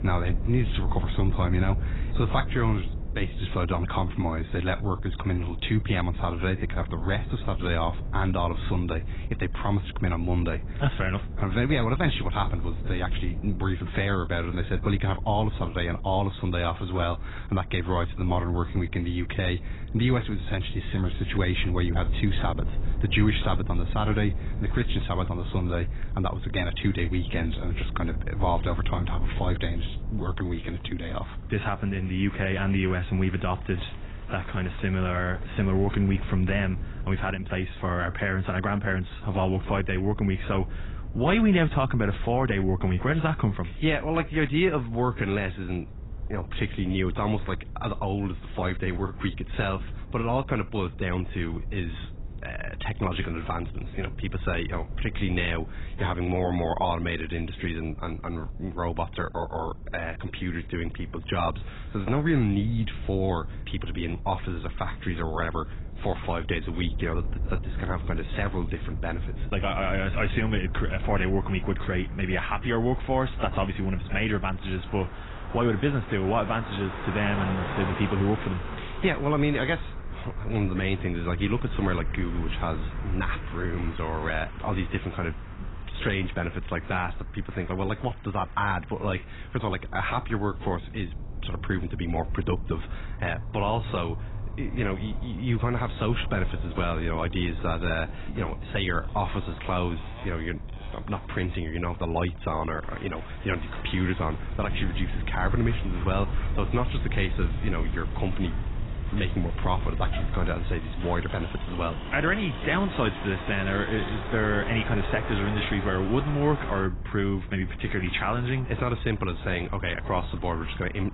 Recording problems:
garbled, watery; badly; nothing above 4 kHz
traffic noise; noticeable; throughout; 15 dB below the speech
wind noise on the microphone; occasional gusts; 20 dB below the speech

